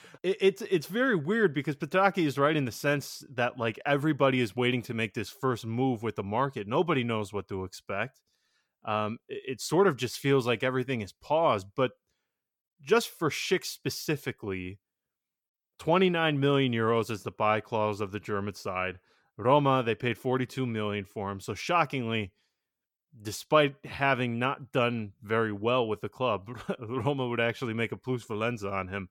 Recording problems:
none

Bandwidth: 17.5 kHz